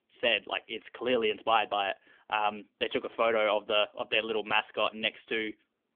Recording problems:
phone-call audio; nothing above 3.5 kHz

